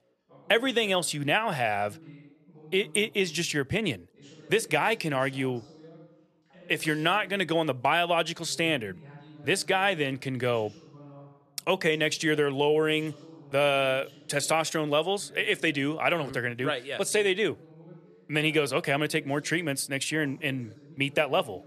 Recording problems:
background chatter; faint; throughout; 2 voices, 25 dB below the speech

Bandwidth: 13.5 kHz